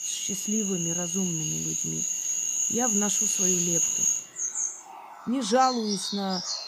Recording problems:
animal sounds; very loud; throughout; 4 dB above the speech

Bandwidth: 15 kHz